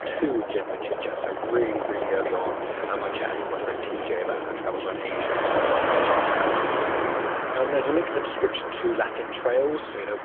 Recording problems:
phone-call audio; nothing above 3.5 kHz
traffic noise; very loud; throughout; 2 dB above the speech

